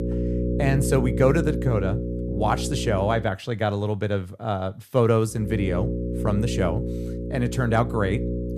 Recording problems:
electrical hum; loud; until 3 s and from 5.5 s on; 60 Hz, 7 dB below the speech

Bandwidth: 14.5 kHz